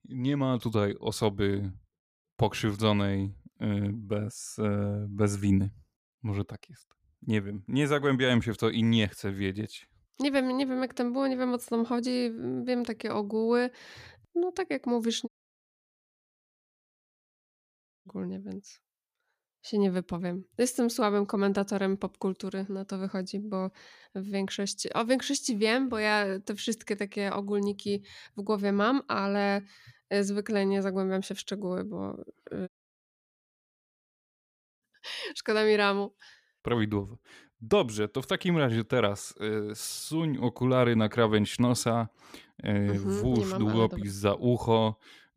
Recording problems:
audio cutting out; at 15 s for 3 s and at 33 s for 2 s

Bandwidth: 15 kHz